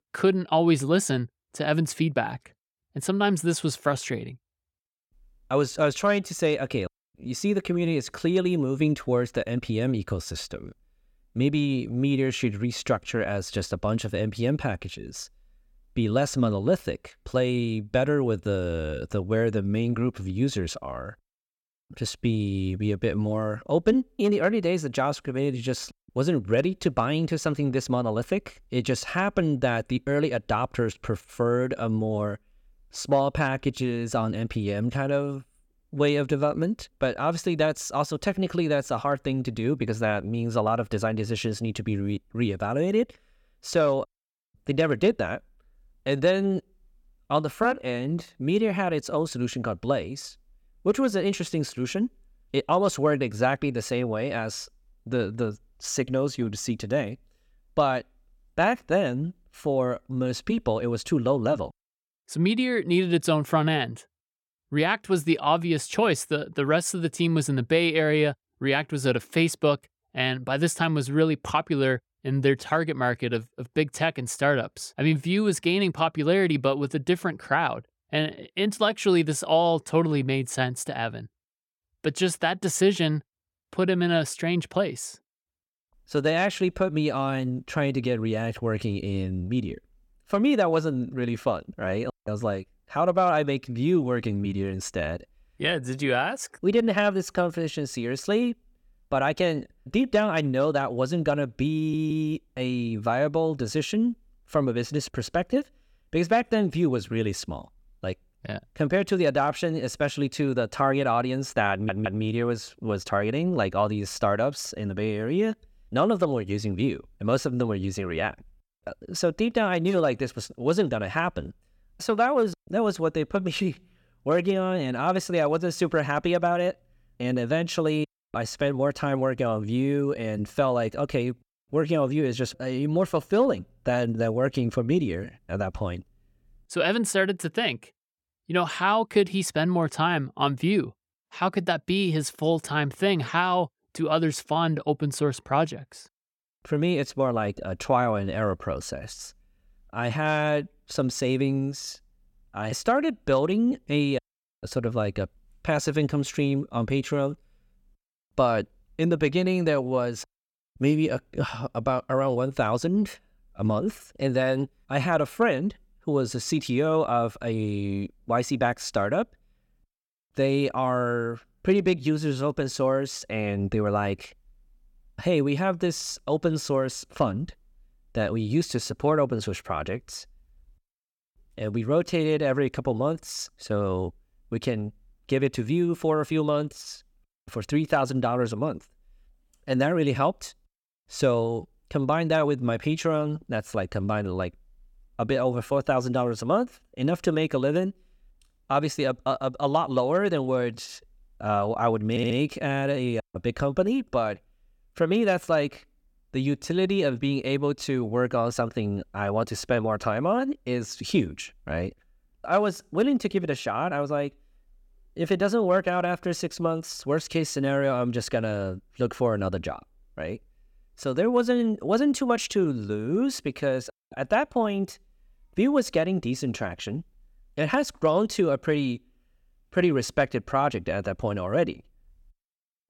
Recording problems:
audio stuttering; at 1:42, at 1:52 and at 3:22

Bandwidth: 17.5 kHz